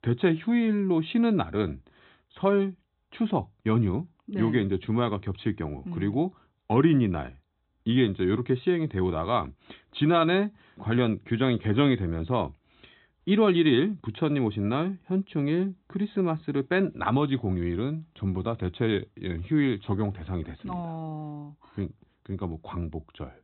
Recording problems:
high frequencies cut off; severe; nothing above 4 kHz

